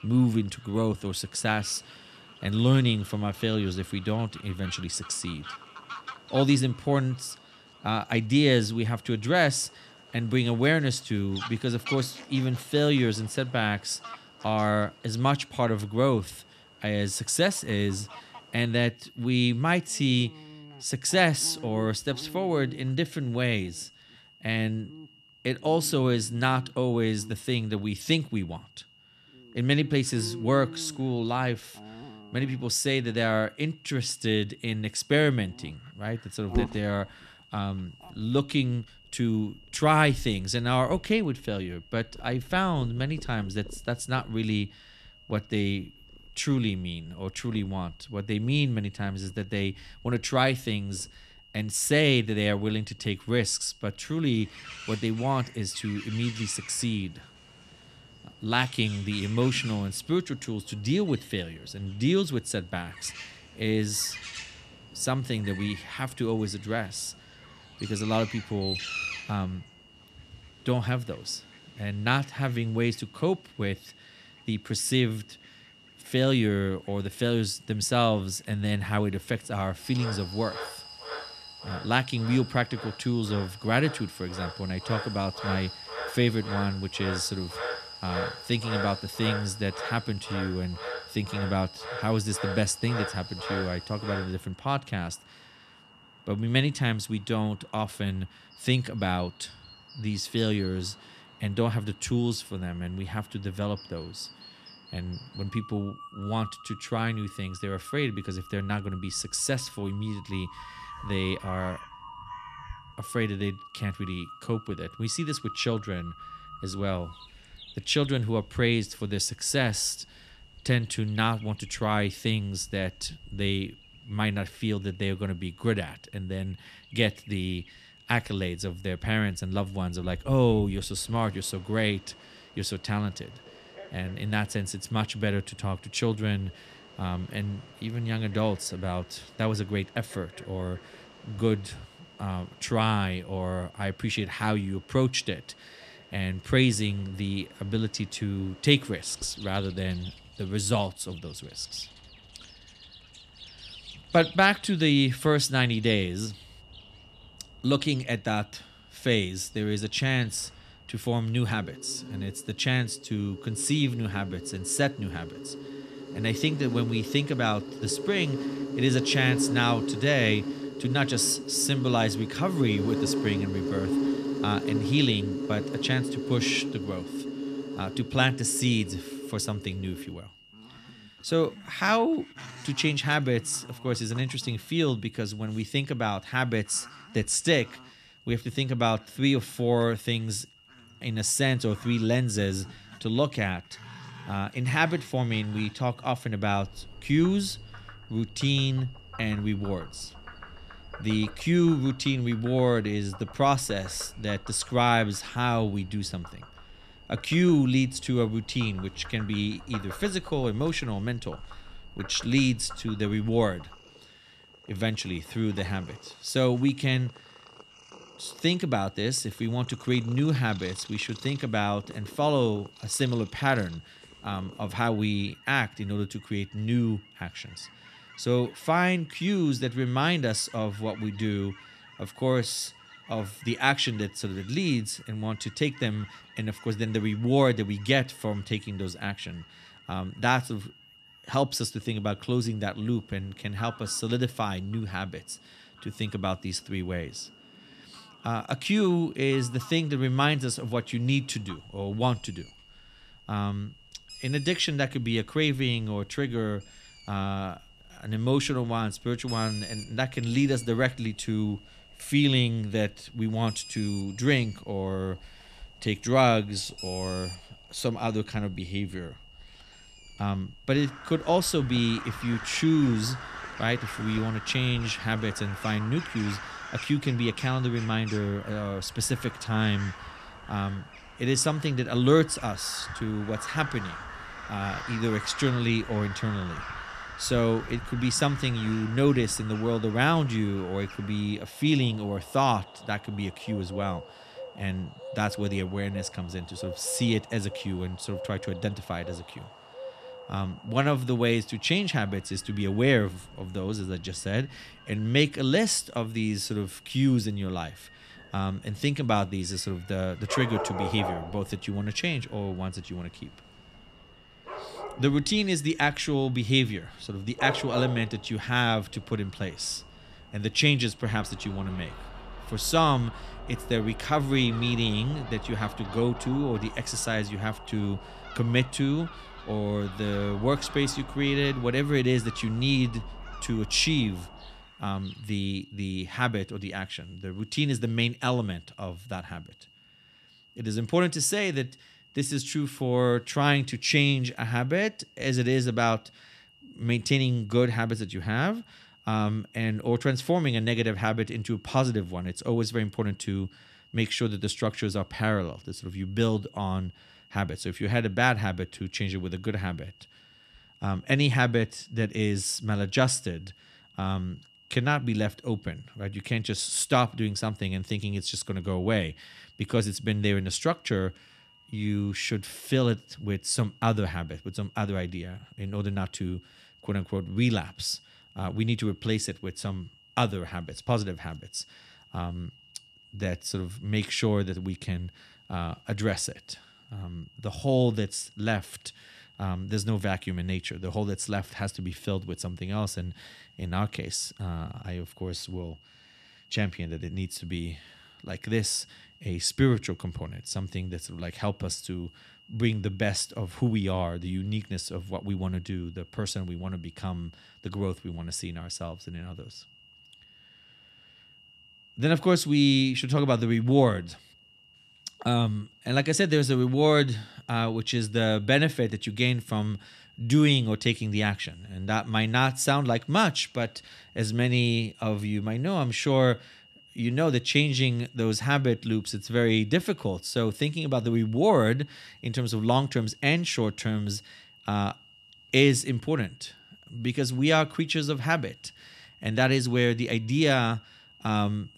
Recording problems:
animal sounds; noticeable; until 5:35; 10 dB below the speech
high-pitched whine; faint; throughout; 3 kHz, 25 dB below the speech

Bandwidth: 14 kHz